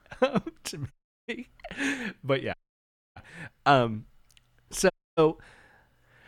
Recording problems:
audio cutting out; at 1 s, at 2.5 s for 0.5 s and at 5 s

